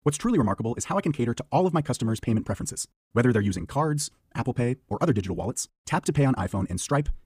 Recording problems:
wrong speed, natural pitch; too fast; 1.5 times normal speed

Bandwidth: 15 kHz